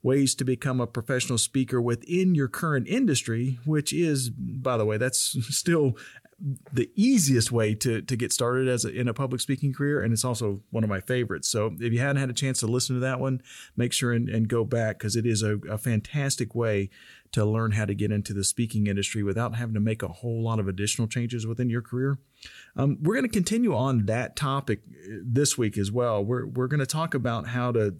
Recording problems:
none

